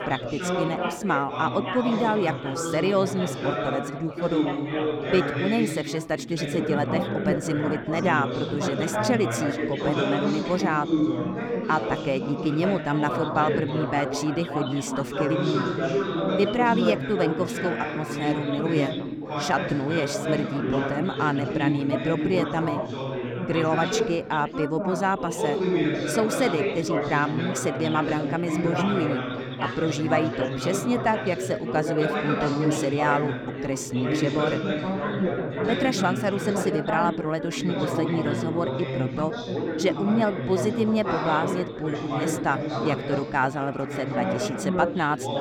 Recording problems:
chatter from many people; loud; throughout; 1 dB below the speech

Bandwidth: 19 kHz